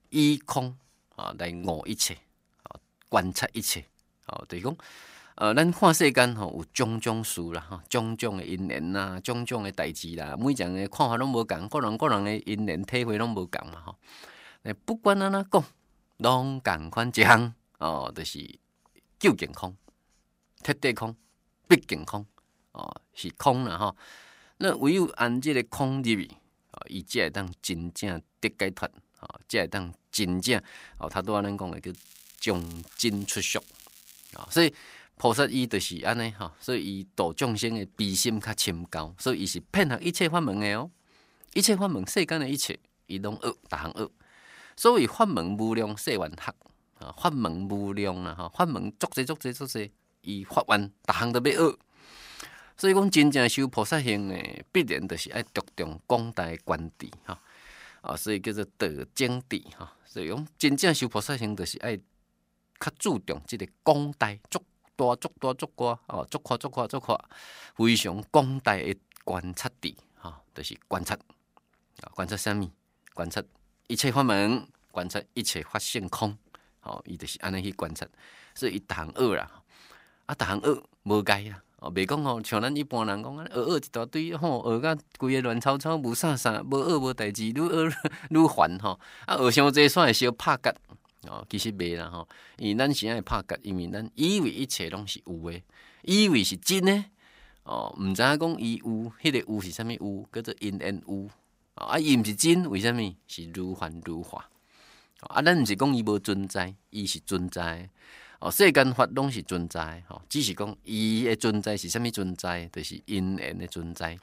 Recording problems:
crackling; faint; from 32 to 35 s; 25 dB below the speech

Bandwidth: 15.5 kHz